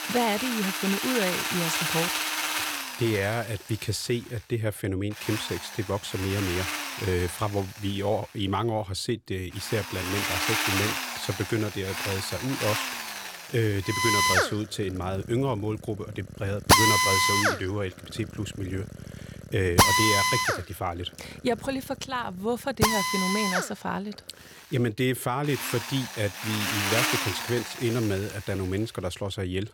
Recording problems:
machinery noise; very loud; throughout; 4 dB above the speech

